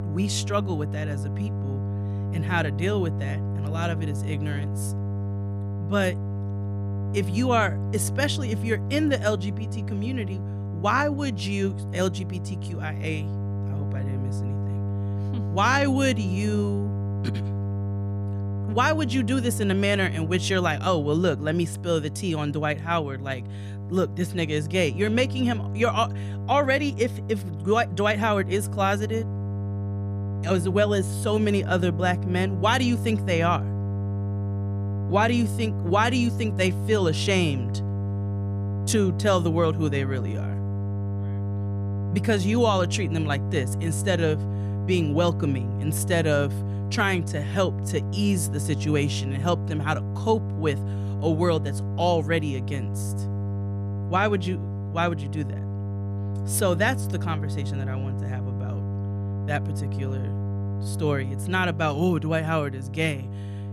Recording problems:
electrical hum; noticeable; throughout; 50 Hz, 15 dB below the speech

